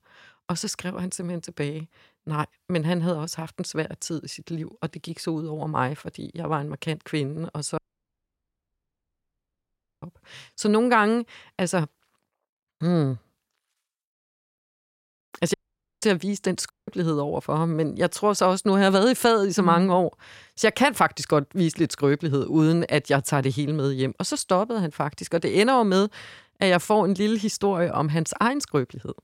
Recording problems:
audio cutting out; at 8 s for 2 s, at 16 s and at 17 s

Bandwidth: 16 kHz